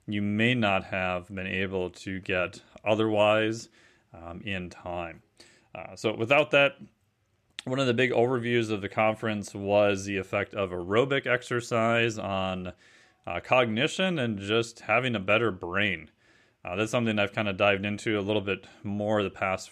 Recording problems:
none

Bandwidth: 14 kHz